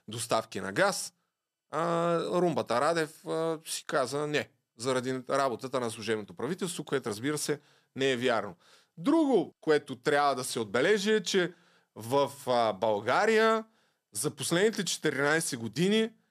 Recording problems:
none

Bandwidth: 14.5 kHz